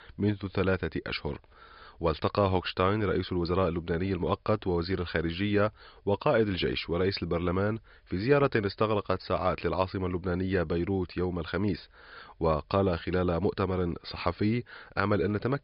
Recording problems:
high frequencies cut off; noticeable; nothing above 5.5 kHz

